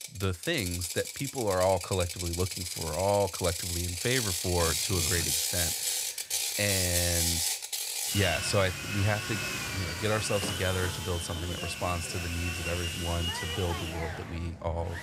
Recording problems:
machinery noise; very loud; throughout; 1 dB above the speech

